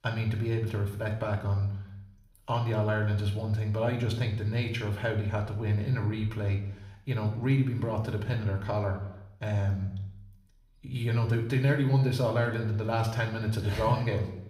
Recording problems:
room echo; slight; dies away in 0.7 s
off-mic speech; somewhat distant

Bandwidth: 15.5 kHz